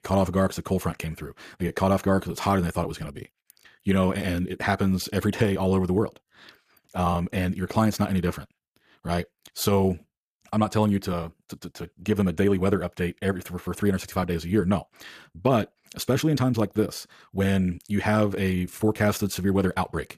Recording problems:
wrong speed, natural pitch; too fast; 1.5 times normal speed

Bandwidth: 14.5 kHz